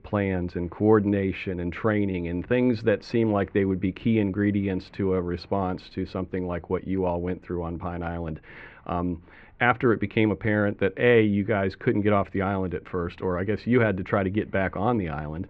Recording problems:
muffled; very; fading above 2.5 kHz

